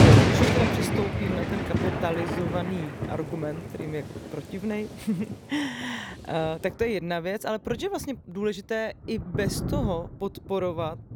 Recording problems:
rain or running water; very loud; throughout; 4 dB above the speech

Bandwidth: 19 kHz